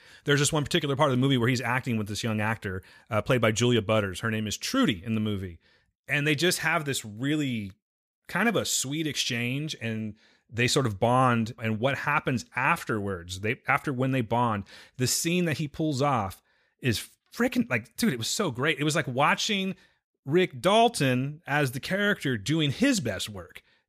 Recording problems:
none

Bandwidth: 15 kHz